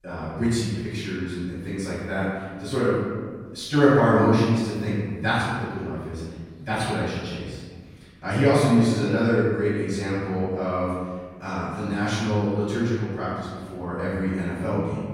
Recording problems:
room echo; strong; dies away in 1.6 s
off-mic speech; far

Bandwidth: 16 kHz